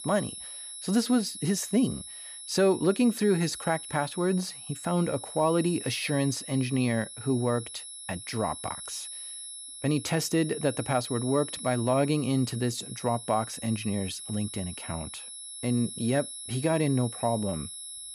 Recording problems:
high-pitched whine; loud; throughout; 11 kHz, 10 dB below the speech

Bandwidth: 14.5 kHz